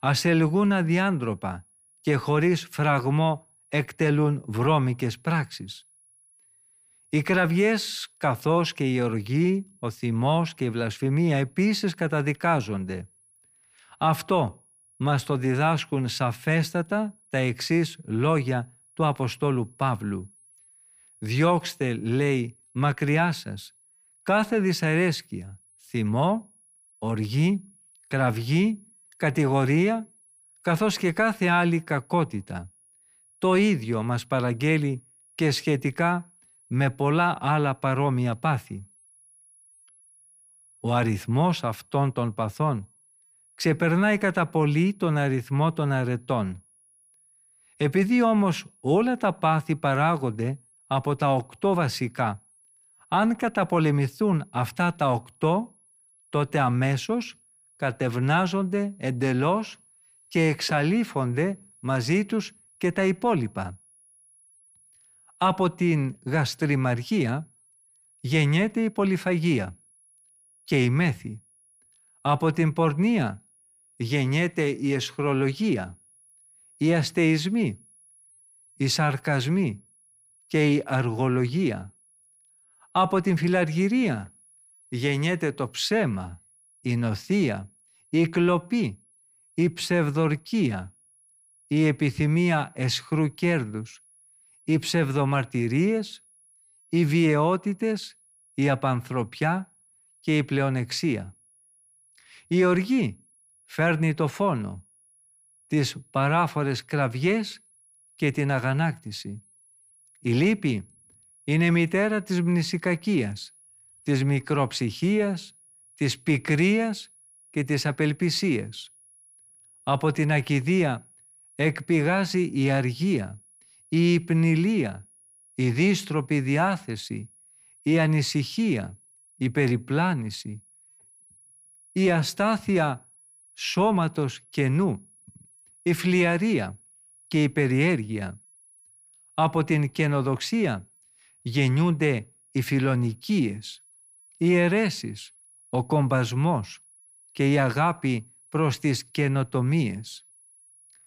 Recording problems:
high-pitched whine; faint; throughout; 10.5 kHz, 30 dB below the speech

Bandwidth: 15 kHz